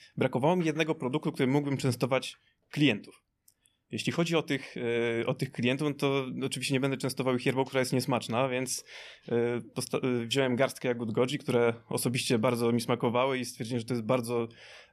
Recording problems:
none

